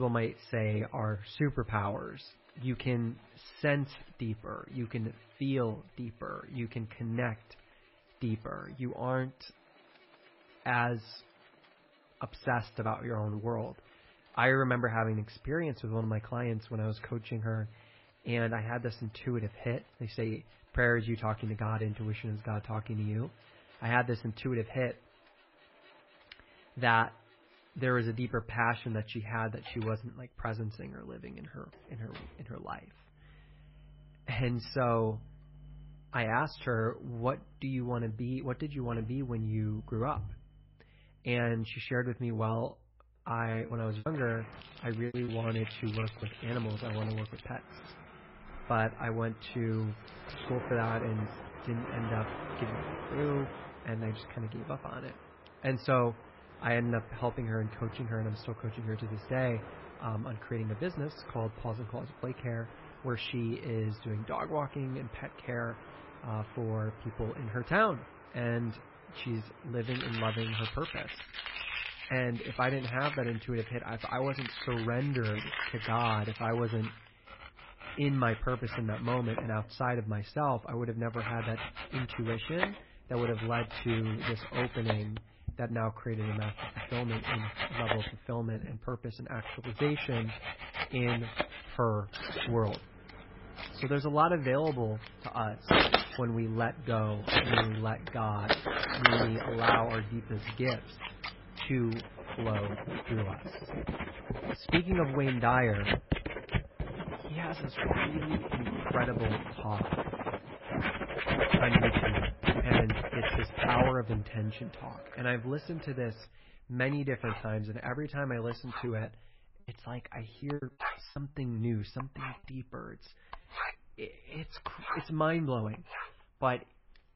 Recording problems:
garbled, watery; badly; nothing above 5.5 kHz
muffled; very slightly; fading above 2.5 kHz
household noises; loud; throughout; 1 dB below the speech
abrupt cut into speech; at the start
choppy; very; from 44 to 46 s and from 2:00 to 2:01; 10% of the speech affected

